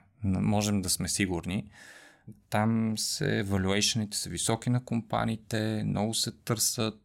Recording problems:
none

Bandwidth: 16 kHz